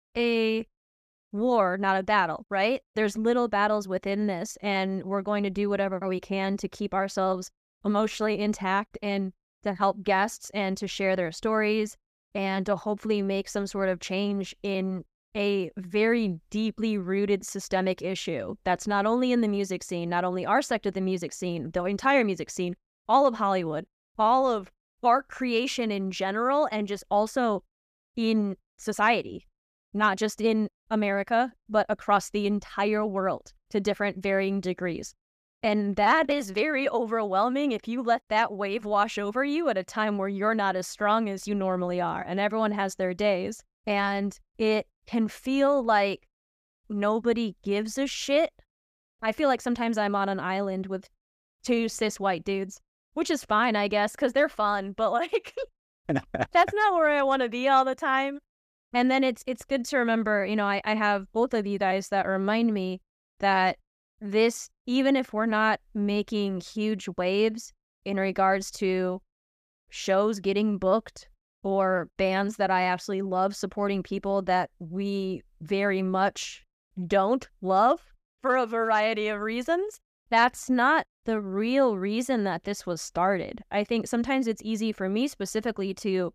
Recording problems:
none

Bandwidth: 14.5 kHz